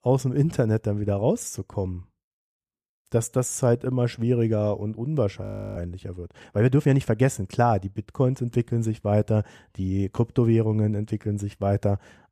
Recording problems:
audio freezing; at 5.5 s

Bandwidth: 14.5 kHz